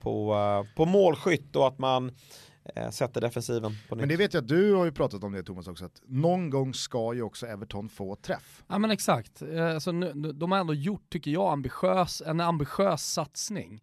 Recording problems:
none

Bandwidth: 13.5 kHz